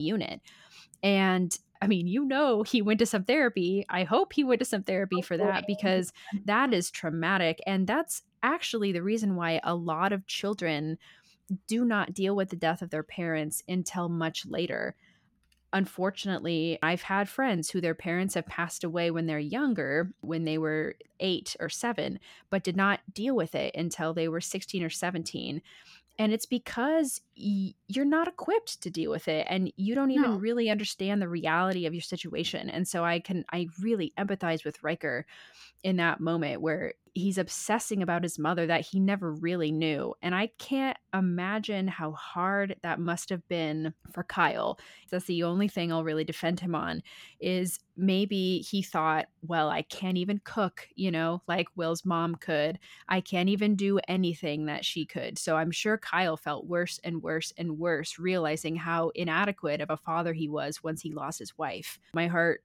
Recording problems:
abrupt cut into speech; at the start

